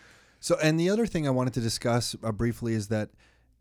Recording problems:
none

